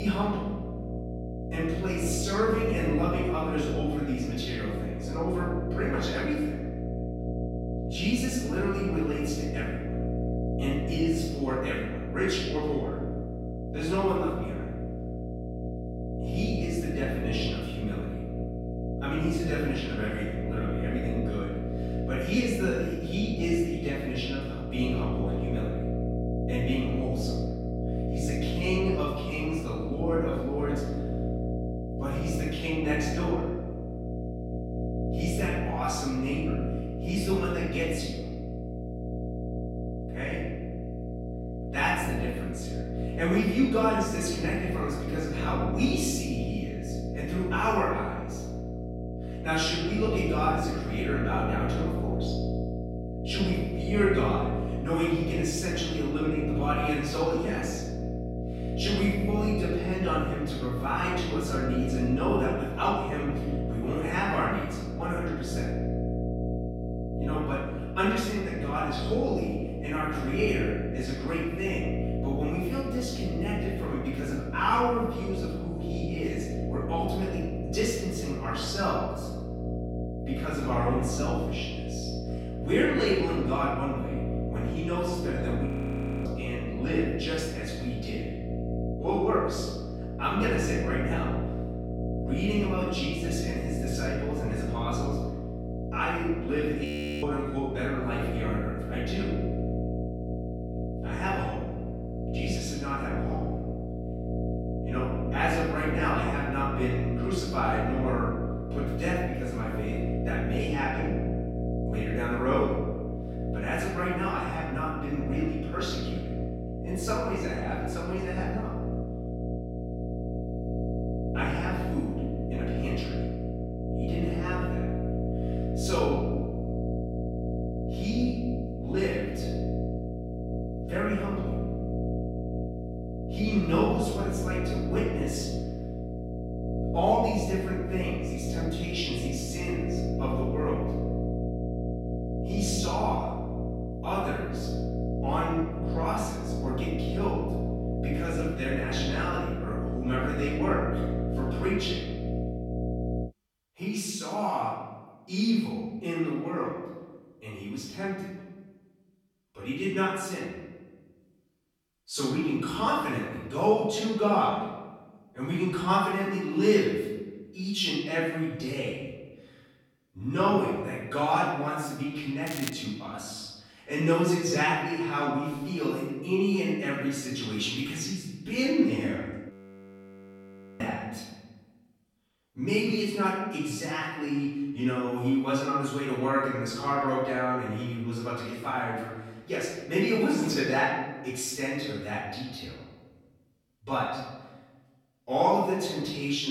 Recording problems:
room echo; strong; dies away in 1.2 s
off-mic speech; far
electrical hum; loud; until 2:33; 60 Hz, 7 dB below the speech
crackling; loud; at 2:52; 8 dB below the speech
abrupt cut into speech; at the start and the end
audio freezing; at 1:26 for 0.5 s, at 1:37 and at 3:00 for 1.5 s

